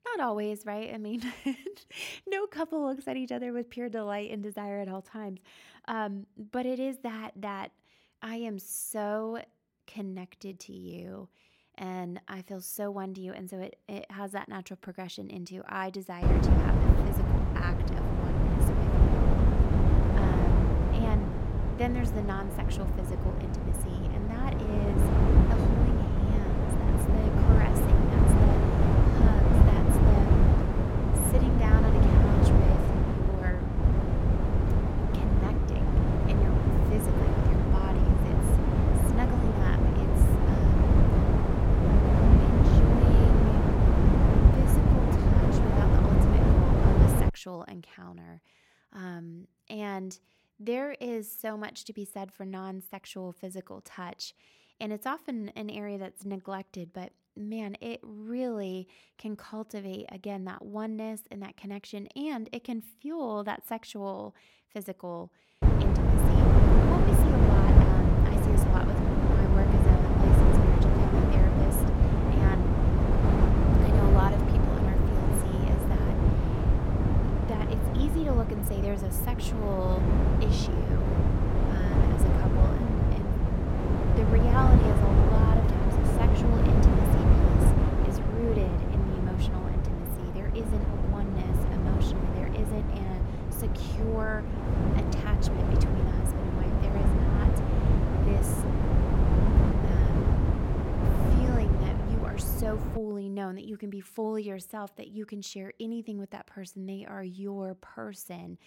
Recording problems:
wind noise on the microphone; heavy; from 16 to 47 s and from 1:06 to 1:43; 5 dB above the speech

